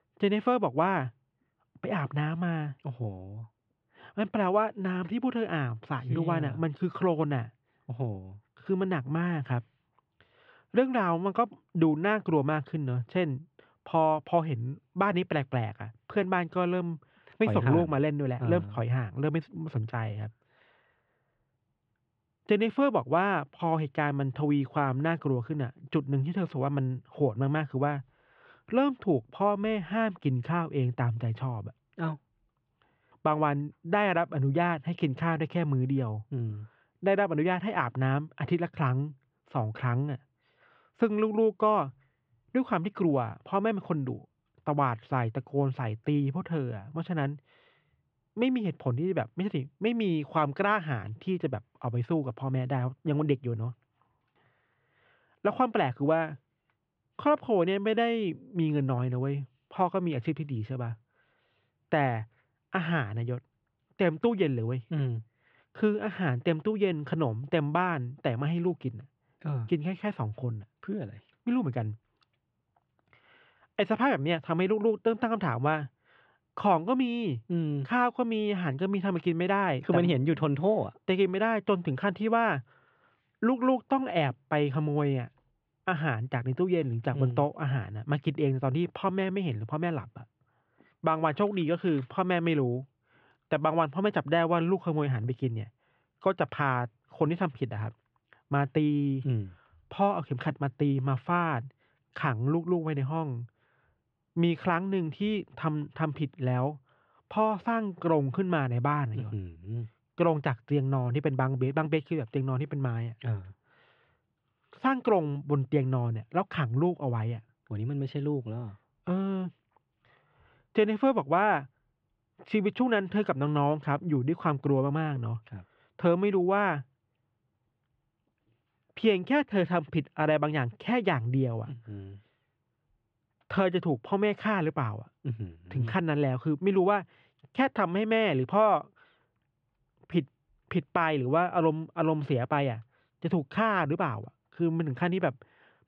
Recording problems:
muffled; very; fading above 3 kHz

